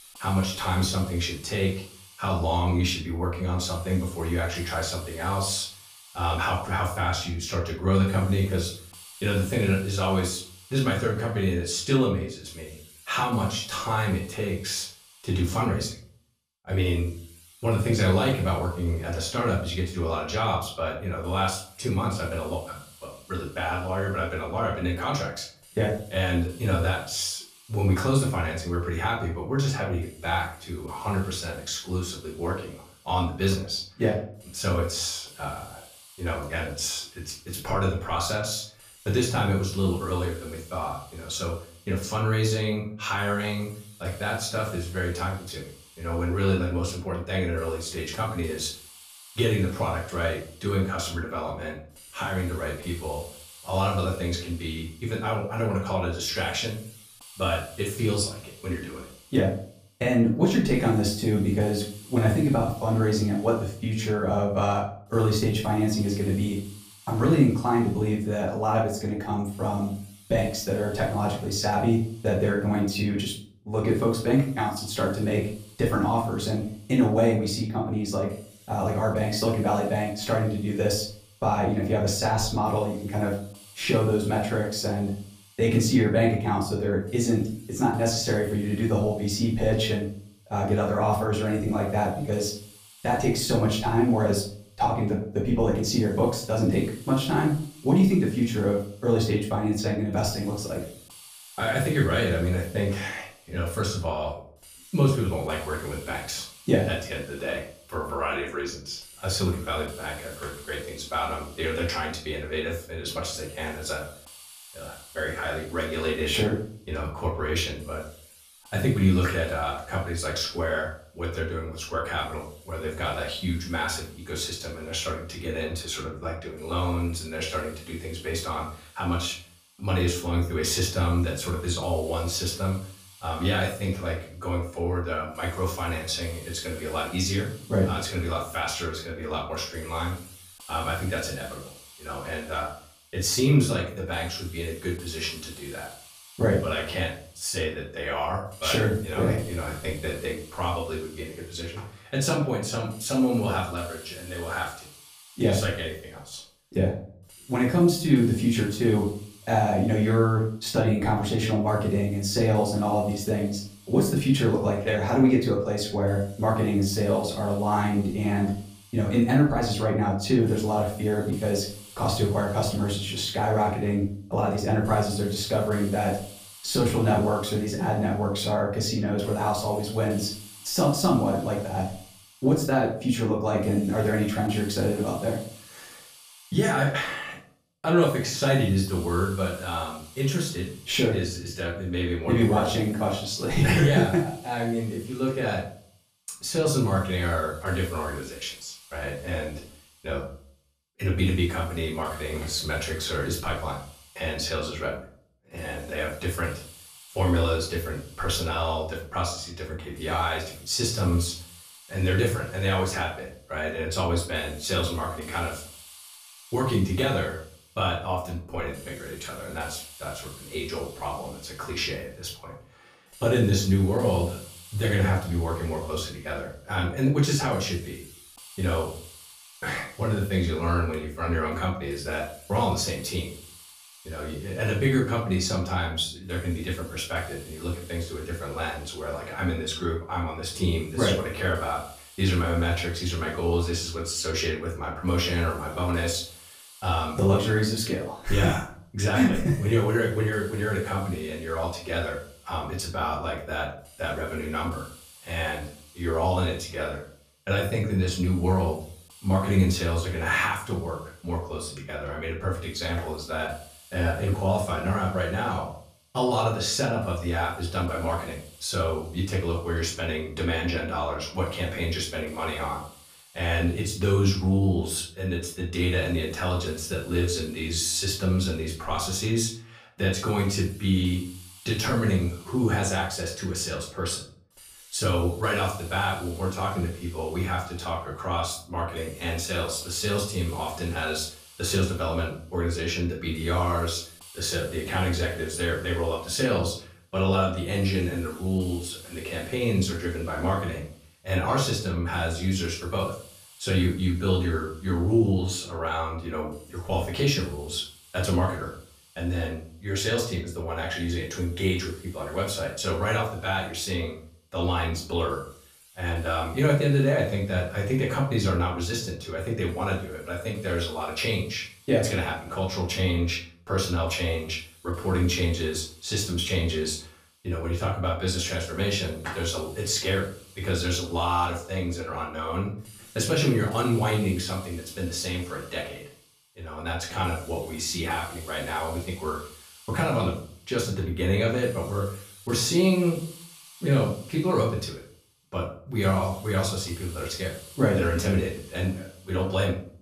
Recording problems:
off-mic speech; far
room echo; slight; dies away in 0.4 s
hiss; faint; throughout; 20 dB below the speech

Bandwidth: 15 kHz